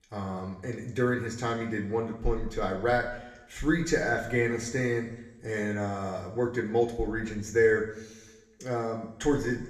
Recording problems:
room echo; slight; dies away in 0.9 s
off-mic speech; somewhat distant

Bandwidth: 14.5 kHz